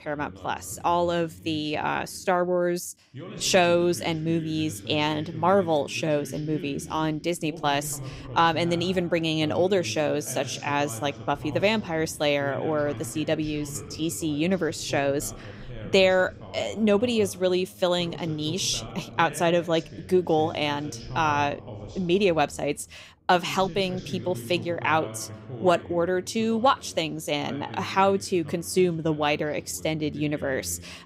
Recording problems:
voice in the background; noticeable; throughout; 15 dB below the speech

